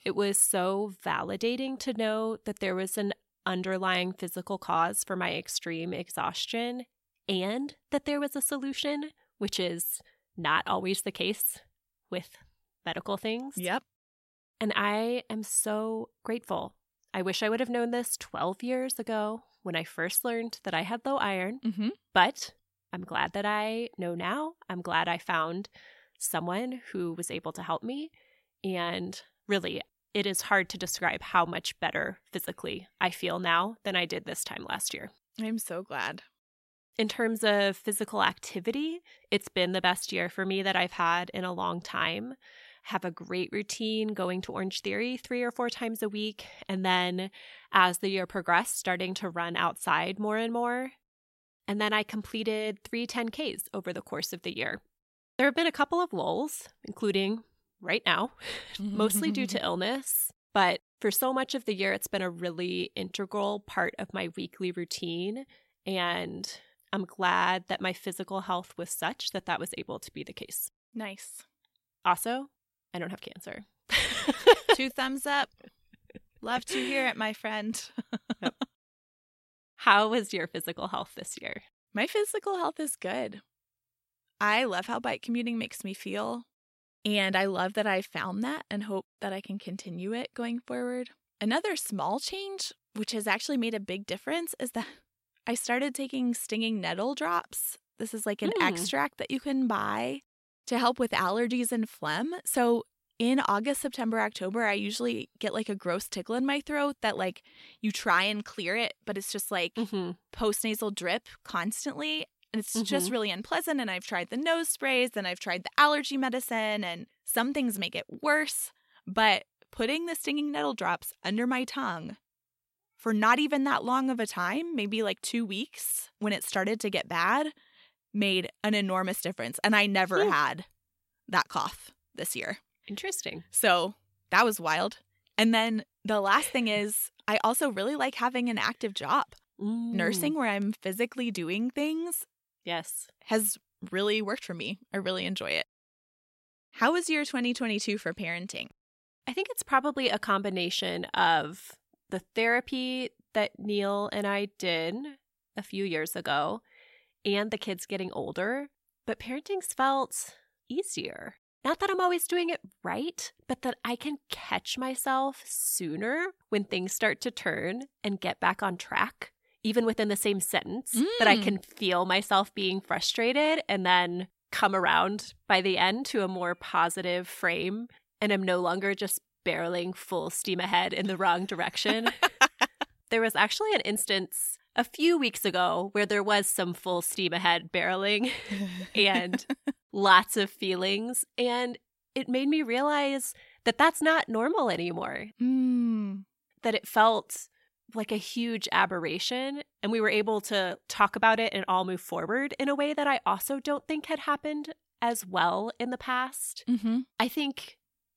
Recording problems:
none

